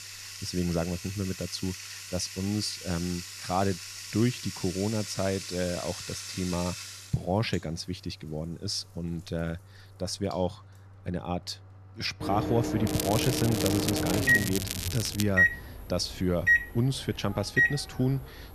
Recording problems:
household noises; very loud; throughout; 1 dB above the speech
crackling; loud; from 13 to 15 s; 2 dB below the speech

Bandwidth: 14 kHz